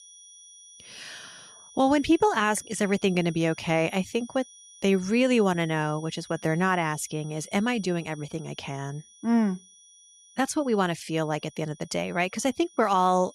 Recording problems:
high-pitched whine; faint; throughout; 6 kHz, 25 dB below the speech

